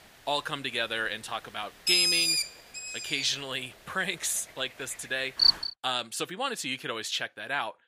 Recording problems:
thin; somewhat; fading below 800 Hz
animal sounds; very loud; until 5.5 s; 6 dB above the speech

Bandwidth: 15 kHz